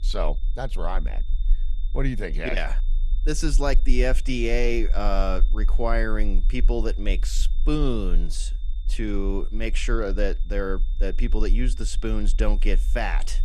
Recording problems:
high-pitched whine; faint; throughout; 3.5 kHz, 25 dB below the speech
low rumble; faint; throughout; 25 dB below the speech

